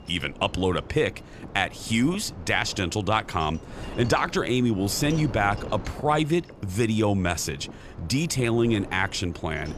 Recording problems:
wind noise on the microphone; occasional gusts; 20 dB below the speech

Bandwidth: 14.5 kHz